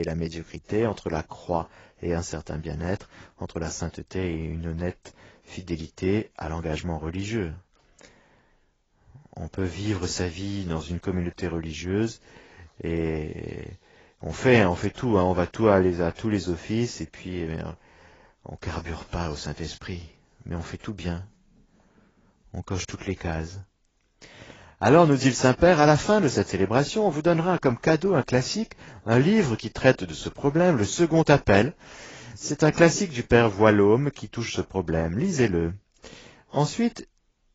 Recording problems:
garbled, watery; badly; nothing above 7.5 kHz
abrupt cut into speech; at the start

